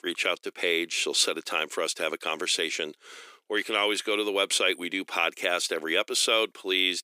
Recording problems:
thin; very; fading below 300 Hz

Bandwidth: 15 kHz